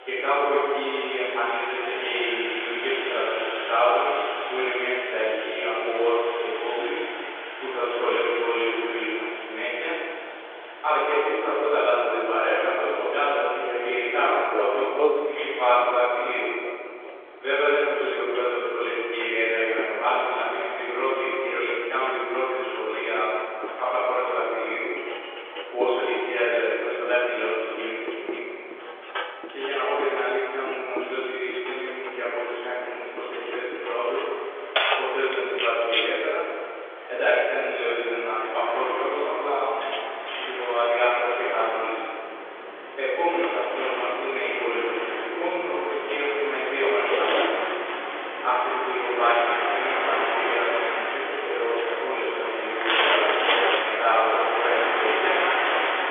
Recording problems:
room echo; strong; dies away in 2.3 s
off-mic speech; far
phone-call audio; nothing above 3.5 kHz
household noises; loud; throughout; 6 dB below the speech
train or aircraft noise; loud; throughout; 5 dB below the speech

